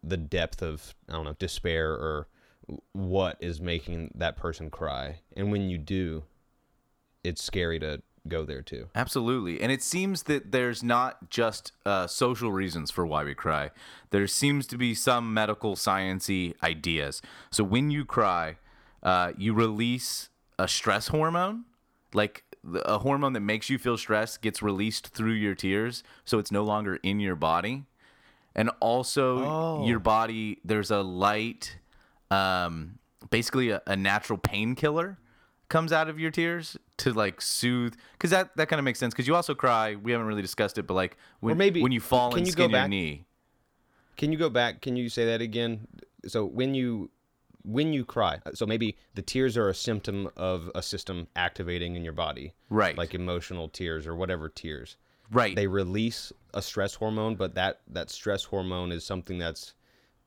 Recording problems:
uneven, jittery; strongly; from 1 to 57 s

